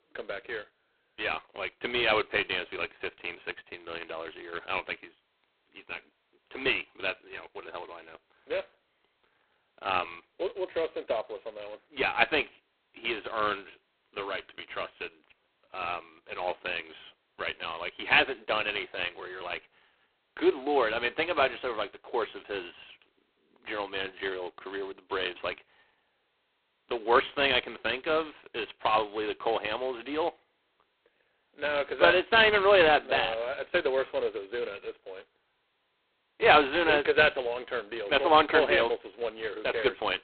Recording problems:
phone-call audio; poor line; nothing above 4 kHz

